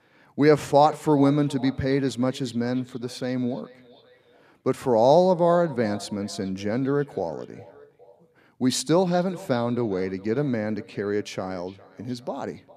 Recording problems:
echo of what is said; faint; throughout; 410 ms later, 20 dB below the speech

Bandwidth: 14.5 kHz